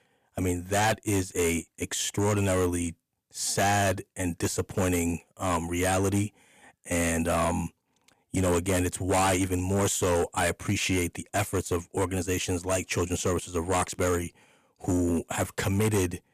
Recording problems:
distortion; heavy; 8% of the sound clipped

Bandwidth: 14.5 kHz